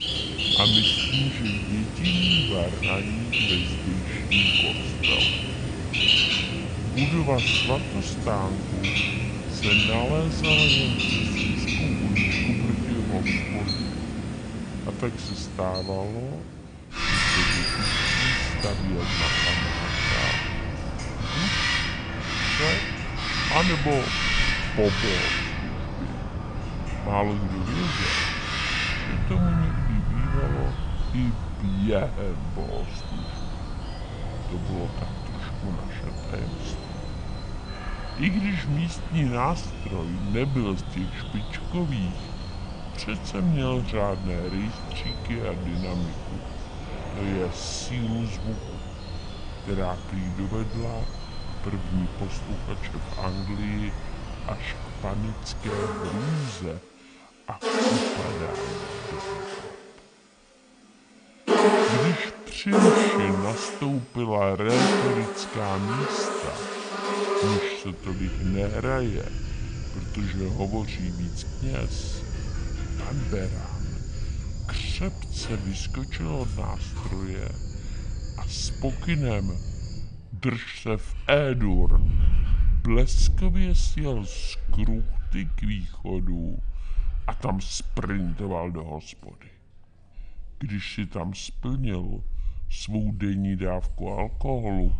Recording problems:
wrong speed and pitch; too slow and too low; 0.7 times normal speed
animal sounds; very loud; throughout; 3 dB above the speech

